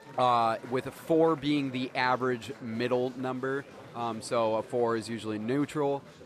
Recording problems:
chatter from many people; noticeable; throughout; 20 dB below the speech

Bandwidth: 14.5 kHz